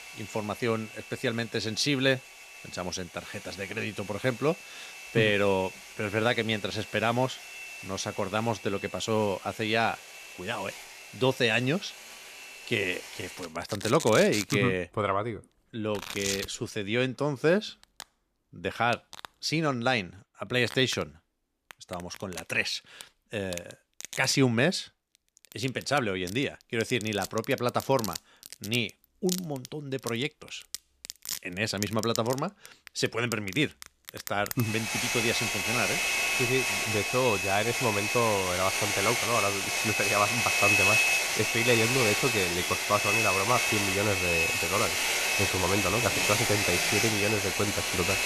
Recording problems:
household noises; very loud; throughout; 2 dB above the speech

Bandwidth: 14.5 kHz